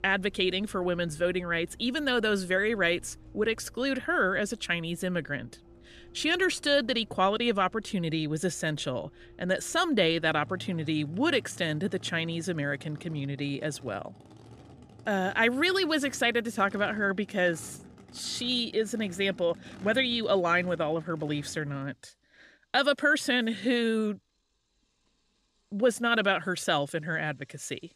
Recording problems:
traffic noise; faint; throughout; 25 dB below the speech

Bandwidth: 14.5 kHz